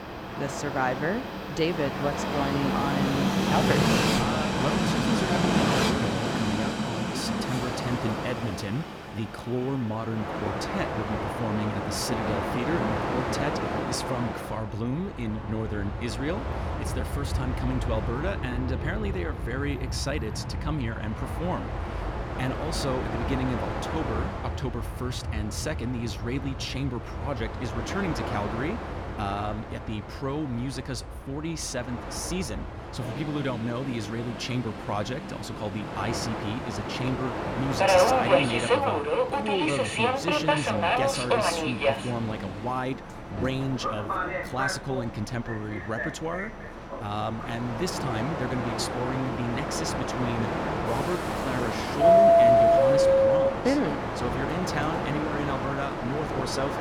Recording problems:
train or aircraft noise; very loud; throughout; 4 dB above the speech

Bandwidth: 18 kHz